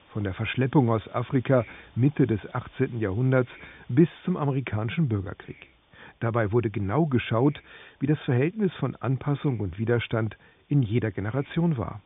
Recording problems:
high frequencies cut off; severe; nothing above 3.5 kHz
hiss; faint; throughout; 30 dB below the speech

